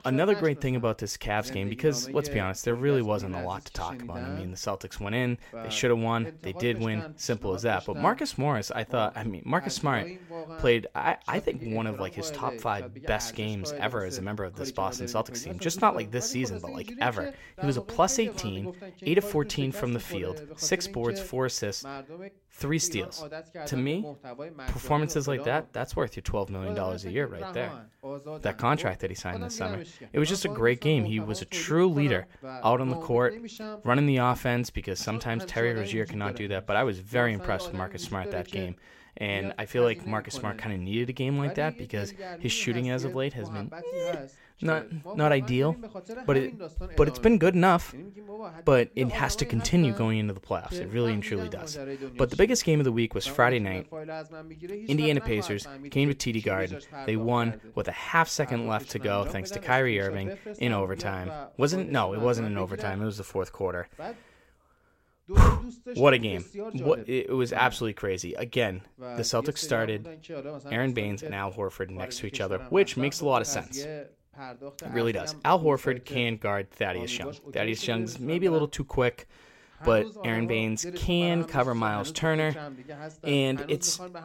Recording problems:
voice in the background; noticeable; throughout; 15 dB below the speech

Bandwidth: 16 kHz